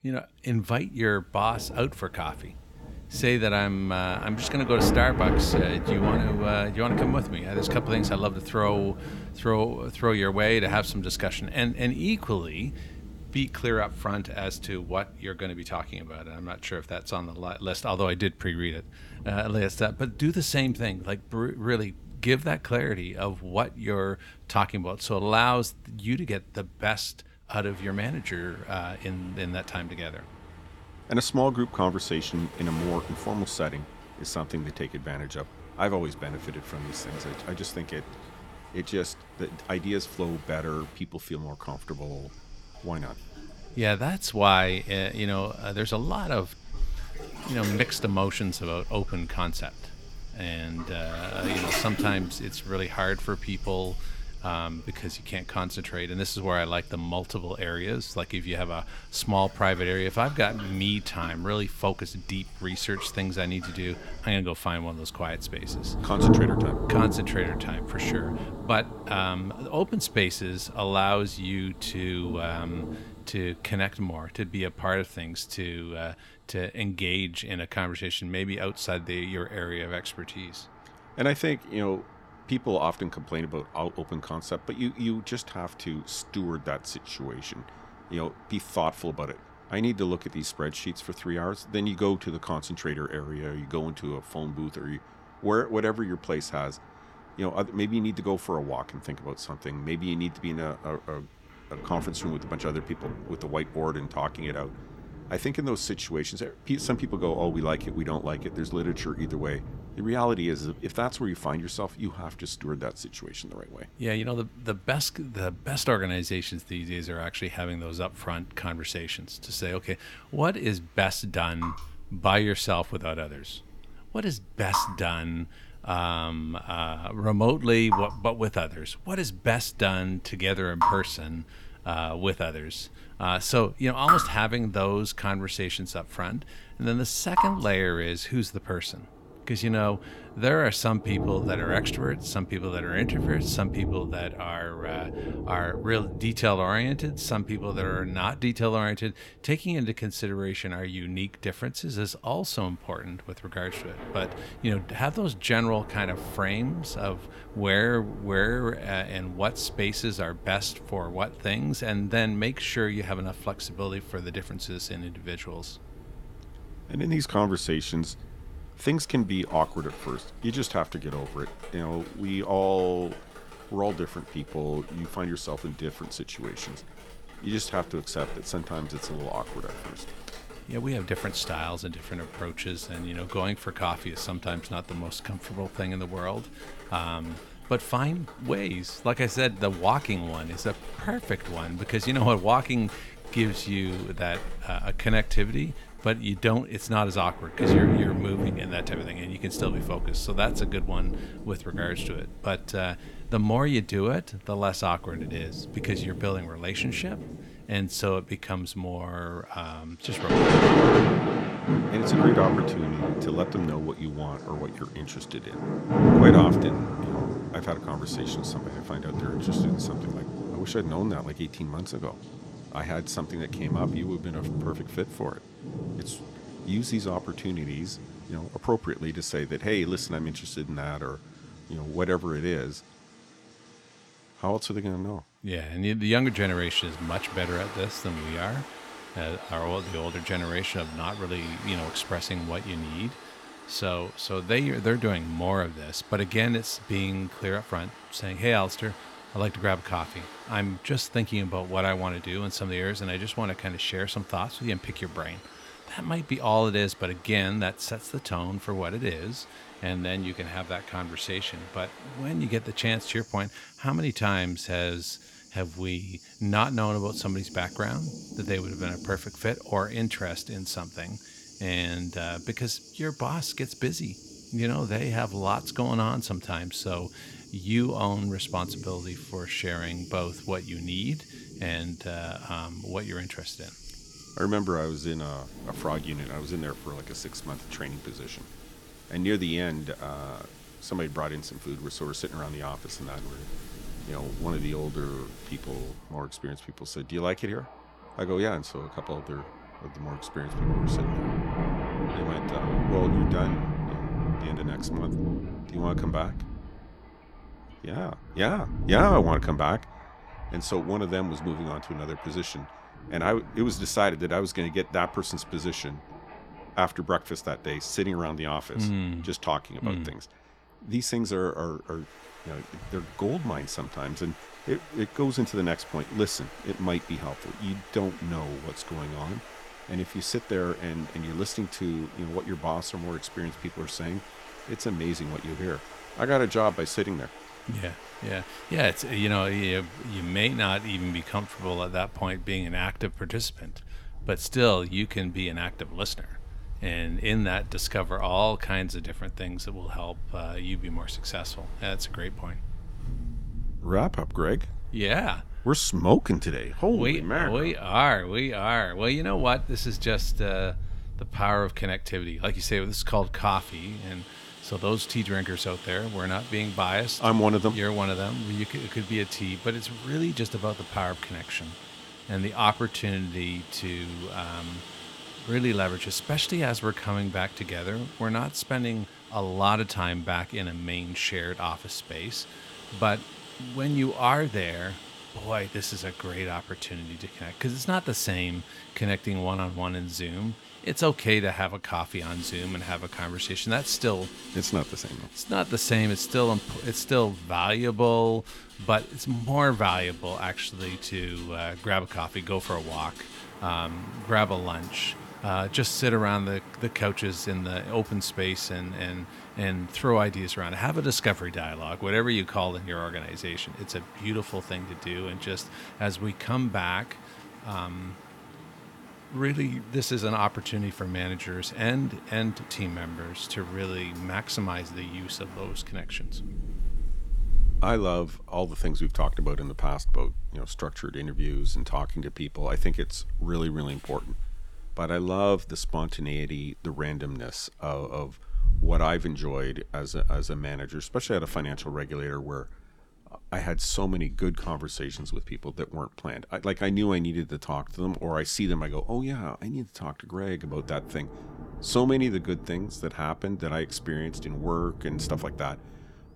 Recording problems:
rain or running water; loud; throughout; 5 dB below the speech

